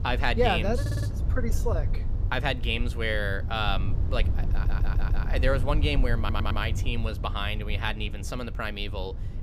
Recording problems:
low rumble; noticeable; throughout; 15 dB below the speech
audio stuttering; at 1 s, at 4.5 s and at 6 s

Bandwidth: 15 kHz